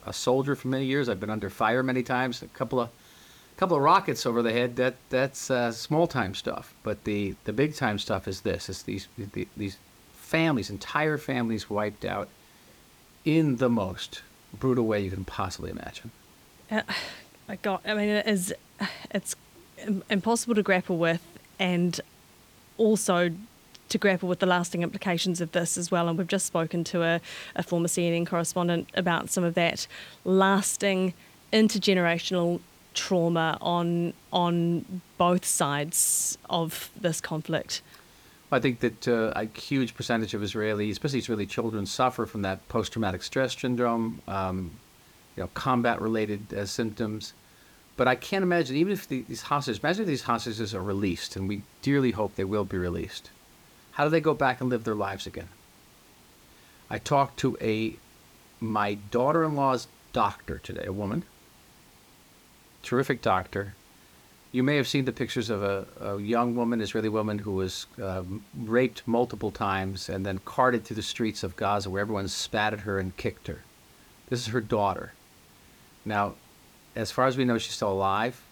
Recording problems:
hiss; faint; throughout; 25 dB below the speech

